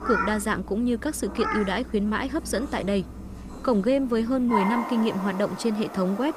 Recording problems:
animal sounds; loud; throughout; 8 dB below the speech

